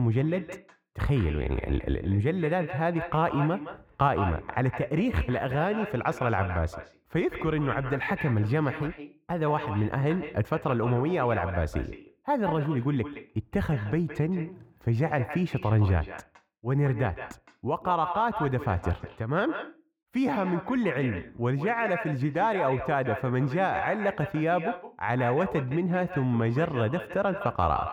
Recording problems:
echo of what is said; strong; throughout; 170 ms later, 10 dB below the speech
muffled; very; fading above 2.5 kHz
abrupt cut into speech; at the start

